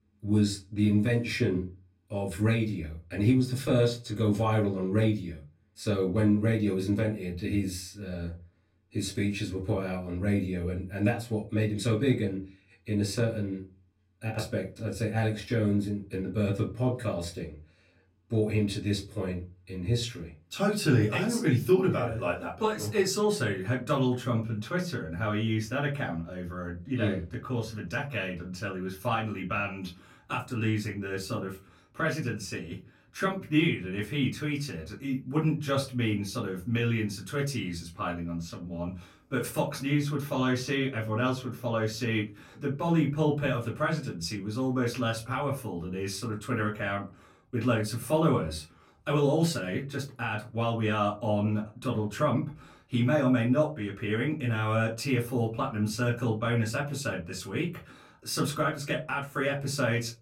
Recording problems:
off-mic speech; far
room echo; very slight; dies away in 0.3 s

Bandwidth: 16 kHz